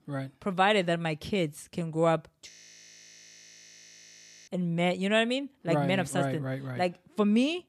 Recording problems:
audio freezing; at 2.5 s for 2 s

